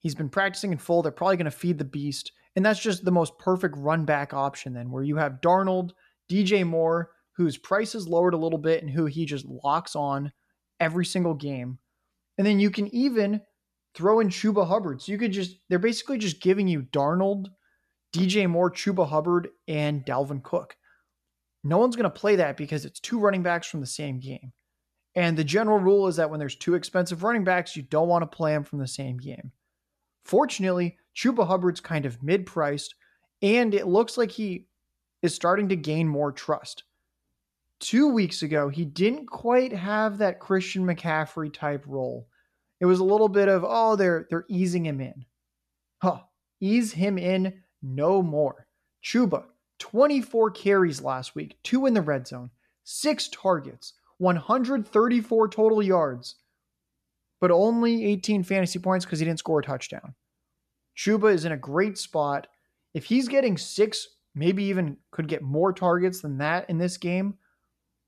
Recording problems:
none

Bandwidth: 13.5 kHz